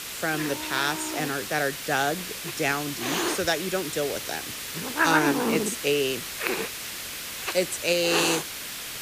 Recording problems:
hiss; loud; throughout; 2 dB below the speech

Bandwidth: 15 kHz